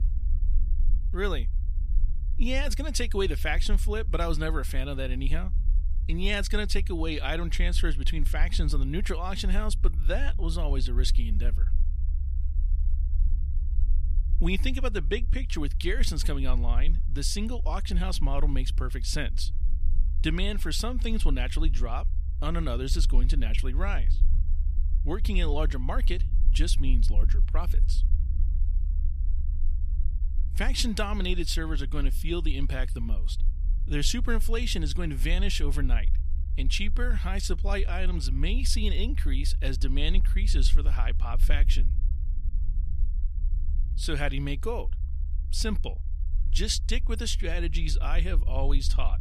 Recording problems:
low rumble; noticeable; throughout; 20 dB below the speech

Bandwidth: 14.5 kHz